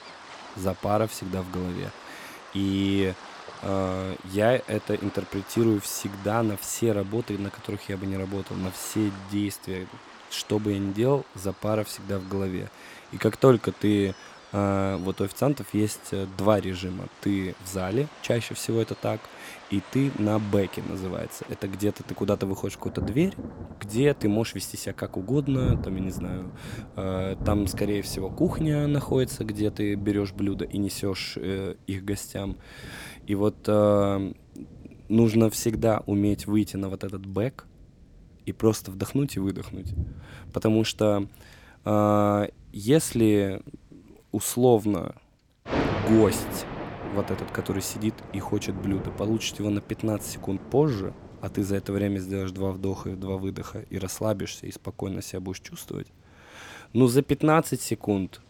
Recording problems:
rain or running water; noticeable; throughout; 15 dB below the speech

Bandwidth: 17 kHz